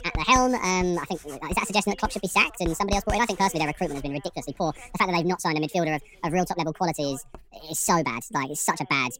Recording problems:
wrong speed and pitch; too fast and too high; 1.6 times normal speed
household noises; noticeable; throughout; 15 dB below the speech
voice in the background; faint; throughout; 25 dB below the speech

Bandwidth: 16 kHz